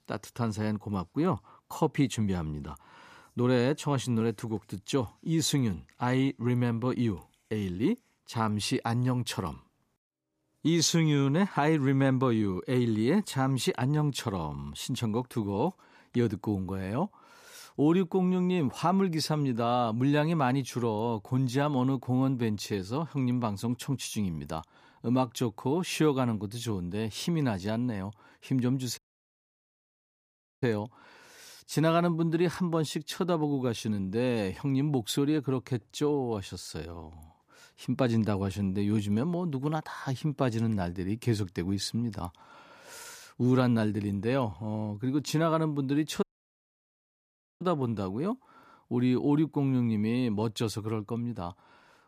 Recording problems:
audio cutting out; at 29 s for 1.5 s and at 46 s for 1.5 s

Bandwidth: 14.5 kHz